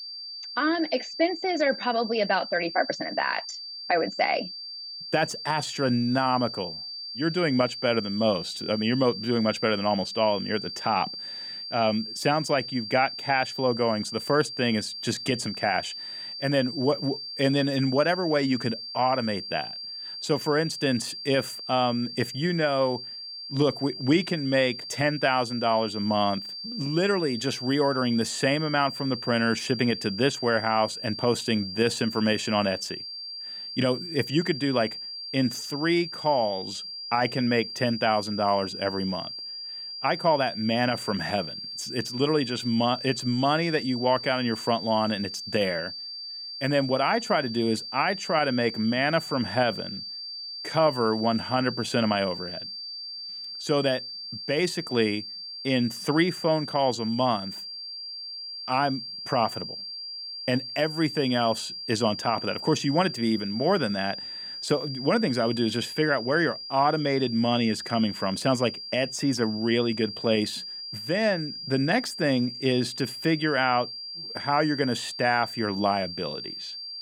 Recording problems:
high-pitched whine; loud; throughout; 4.5 kHz, 8 dB below the speech

